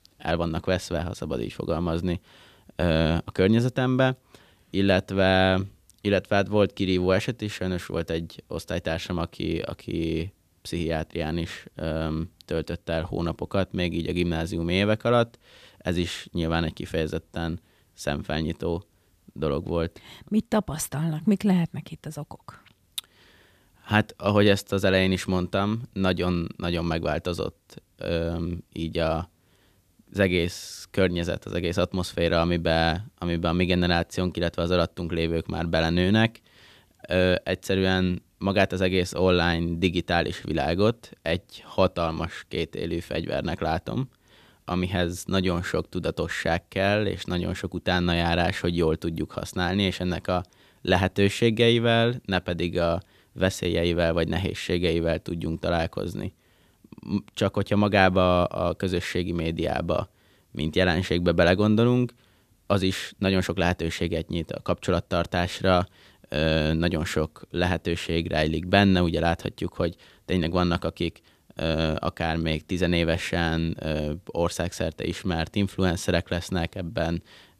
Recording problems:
none

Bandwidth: 14.5 kHz